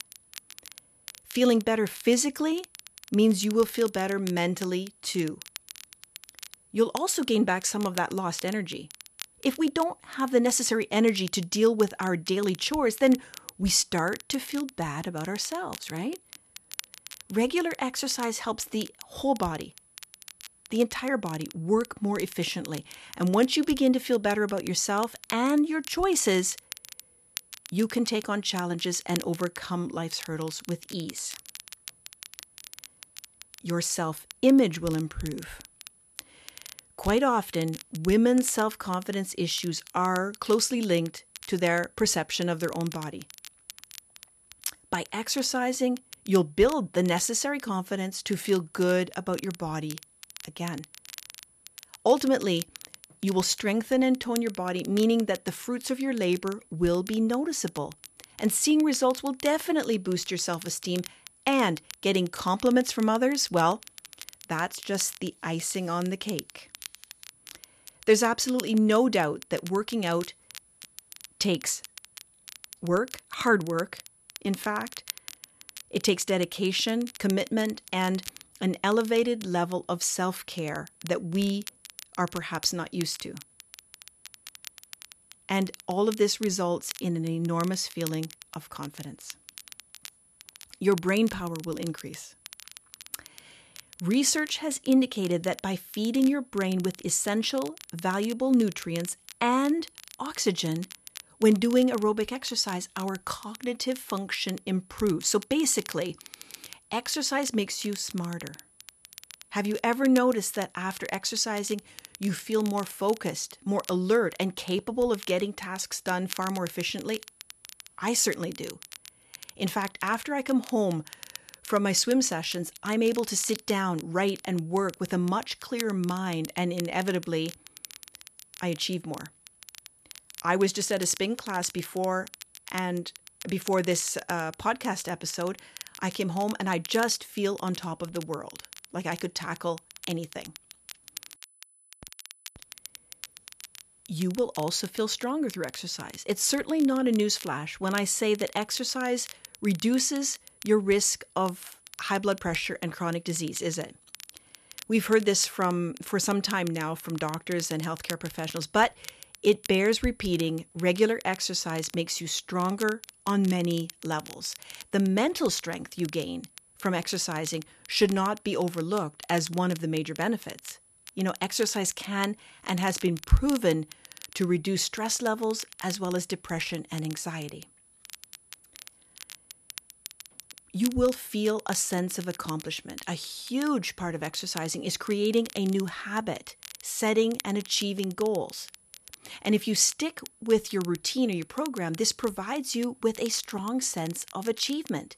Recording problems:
crackle, like an old record; noticeable; 15 dB below the speech
high-pitched whine; faint; throughout; 10 kHz, 30 dB below the speech

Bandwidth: 14 kHz